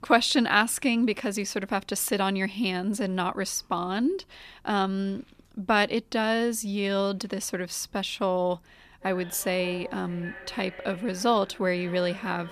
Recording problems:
echo of what is said; noticeable; from 9 s on; 580 ms later, 15 dB below the speech

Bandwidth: 14.5 kHz